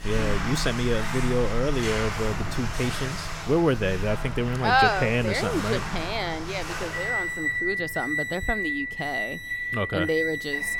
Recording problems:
household noises; loud; throughout; 3 dB below the speech

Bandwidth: 17.5 kHz